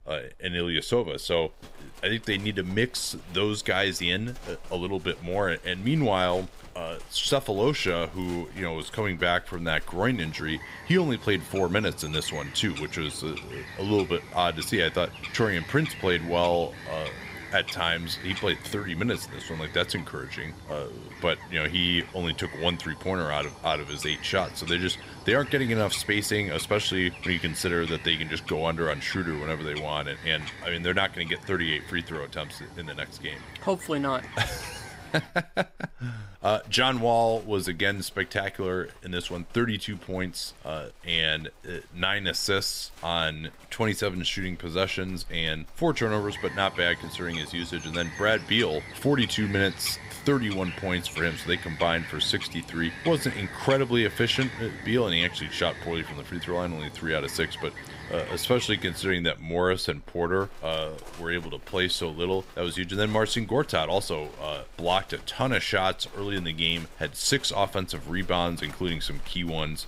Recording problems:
animal sounds; noticeable; throughout; 15 dB below the speech

